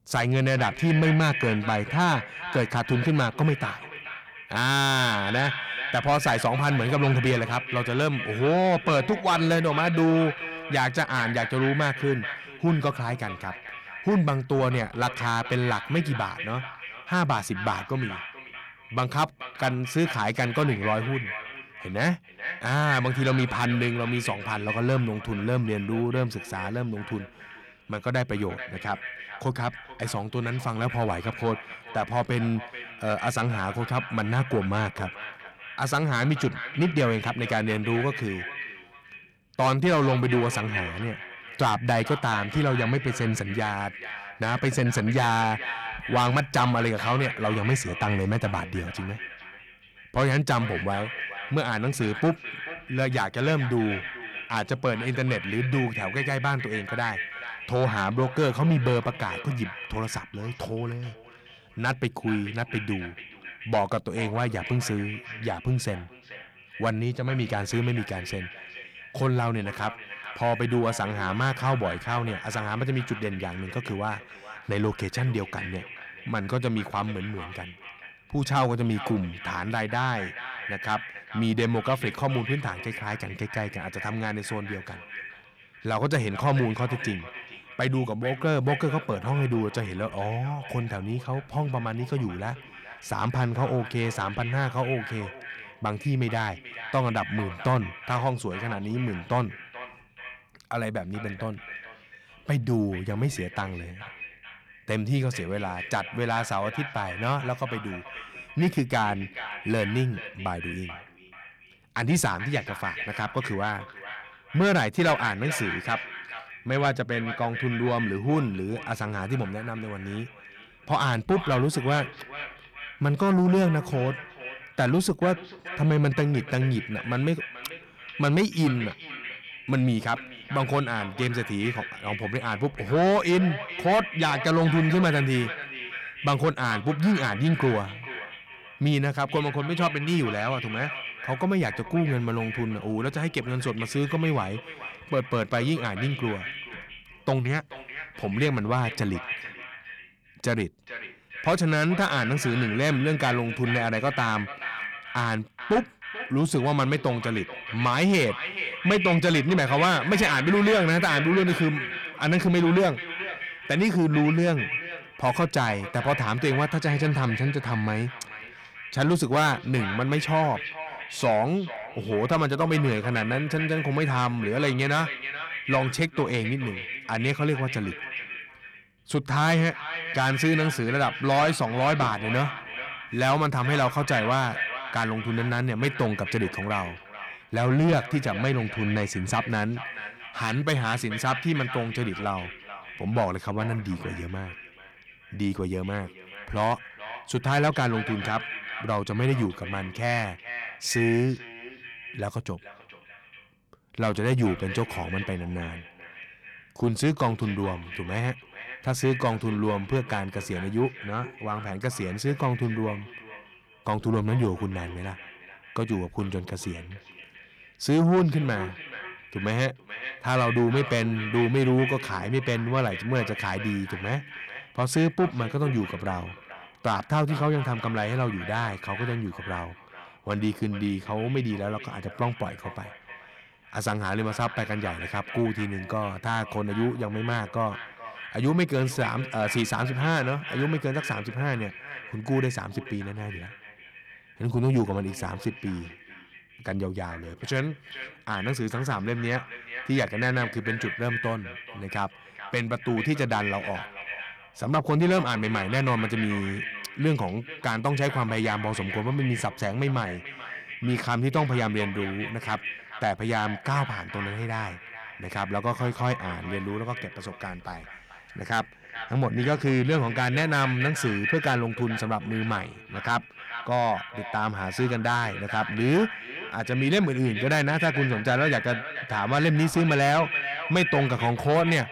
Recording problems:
echo of what is said; strong; throughout; 430 ms later, 9 dB below the speech
distortion; slight; 10 dB below the speech

